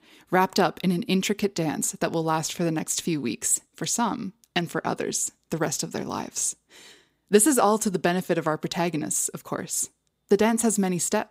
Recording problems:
none

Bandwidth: 15.5 kHz